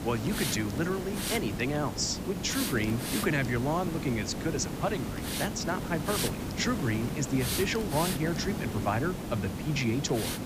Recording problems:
high frequencies cut off; noticeable; nothing above 8 kHz
hiss; loud; throughout; 3 dB below the speech

